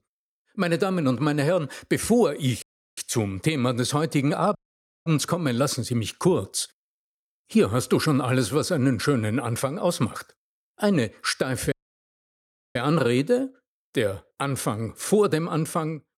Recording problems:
audio cutting out; at 2.5 s, at 4.5 s for 0.5 s and at 12 s for 1 s

